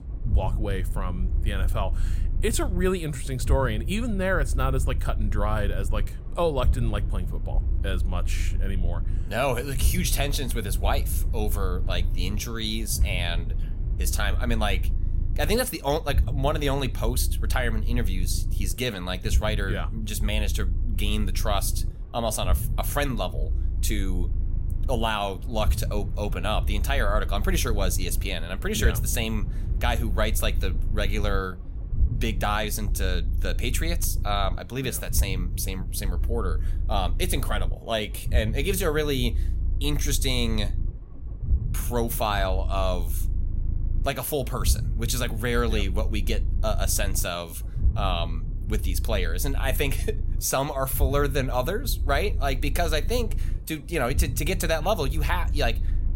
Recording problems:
low rumble; noticeable; throughout; 20 dB below the speech

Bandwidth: 16 kHz